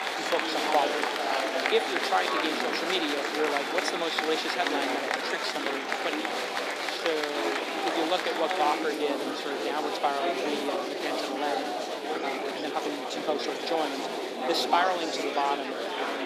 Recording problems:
thin; somewhat; fading below 300 Hz
murmuring crowd; very loud; throughout; 2 dB above the speech
uneven, jittery; strongly; from 5 to 14 s

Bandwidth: 14.5 kHz